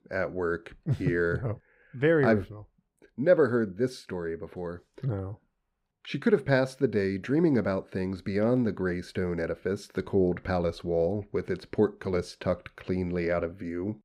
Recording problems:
none

